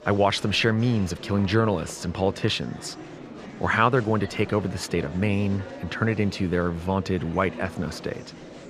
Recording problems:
murmuring crowd; noticeable; throughout; 15 dB below the speech

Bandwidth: 14 kHz